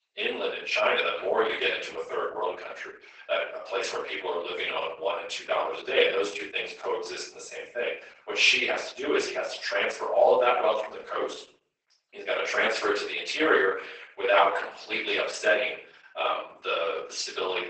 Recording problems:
off-mic speech; far
garbled, watery; badly; nothing above 8 kHz
thin; very; fading below 400 Hz
room echo; noticeable; dies away in 0.5 s

